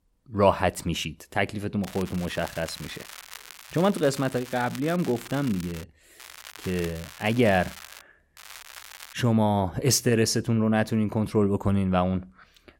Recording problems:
crackling; noticeable; from 2 to 6 s, from 6 to 8 s and at 8.5 s; 15 dB below the speech

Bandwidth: 16.5 kHz